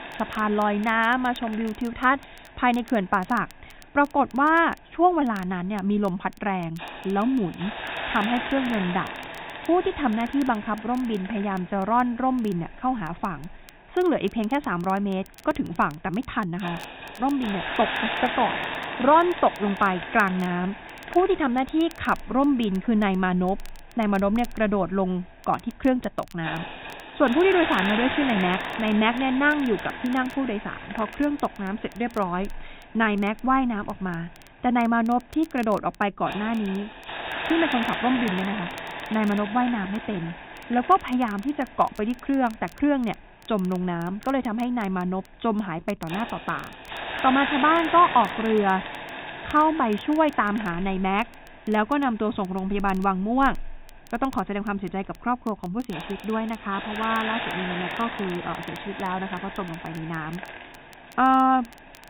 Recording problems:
high frequencies cut off; severe; nothing above 4 kHz
hiss; loud; throughout; 8 dB below the speech
crackle, like an old record; faint; 30 dB below the speech

